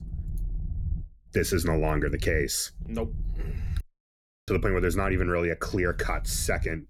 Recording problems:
low rumble; faint; throughout; 25 dB below the speech
audio cutting out; at 4 s for 0.5 s

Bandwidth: 18 kHz